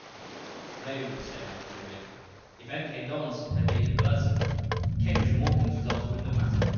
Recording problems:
room echo; strong; dies away in 1.6 s
off-mic speech; far
high frequencies cut off; noticeable; nothing above 6.5 kHz
rain or running water; loud; throughout; 1 dB below the speech
machinery noise; faint; throughout; 30 dB below the speech
low rumble; very faint; from 3.5 s on; 2 dB below the speech

